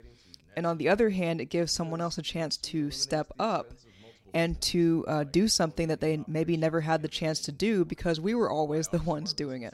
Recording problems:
voice in the background; faint; throughout; 25 dB below the speech

